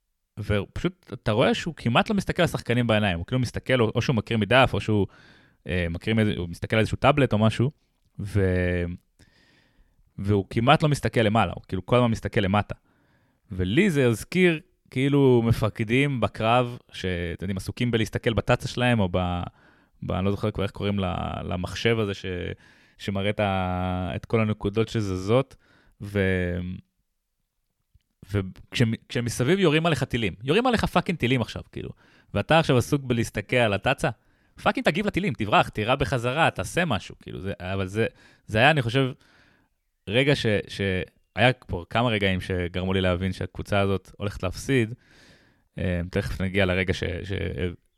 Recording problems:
uneven, jittery; strongly; from 1 to 47 s

